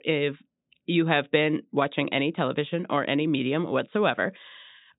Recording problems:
high frequencies cut off; severe; nothing above 4 kHz

